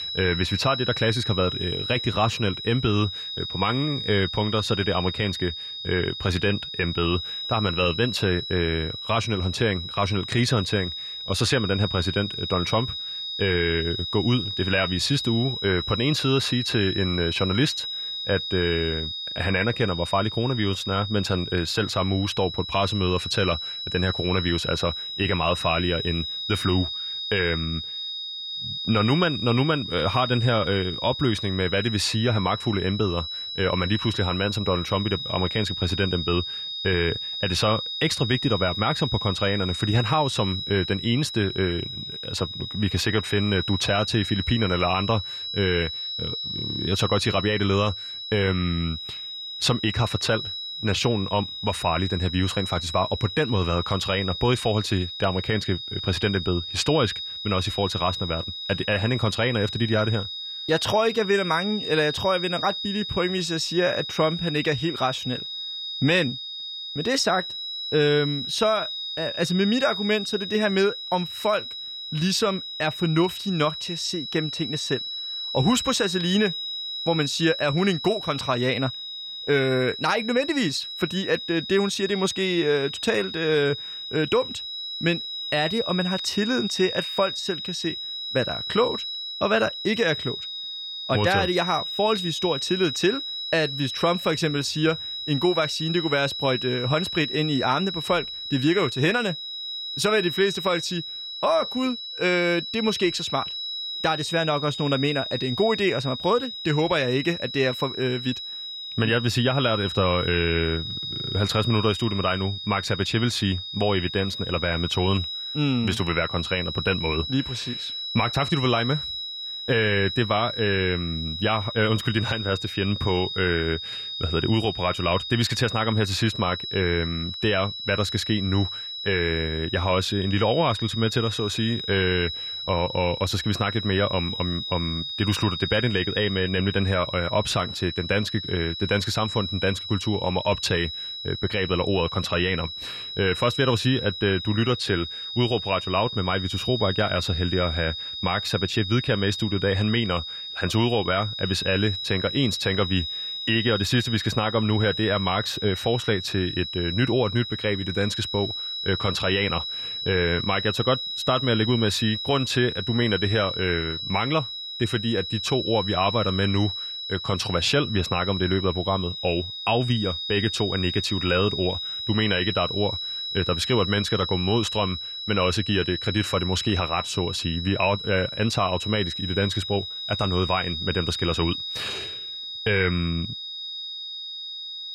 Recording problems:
high-pitched whine; loud; throughout; 4 kHz, 5 dB below the speech

